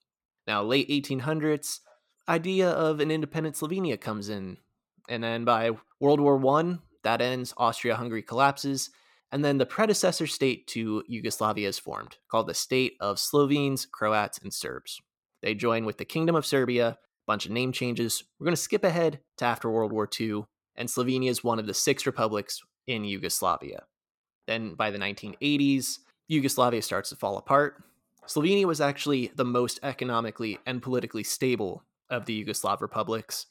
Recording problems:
none

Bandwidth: 17 kHz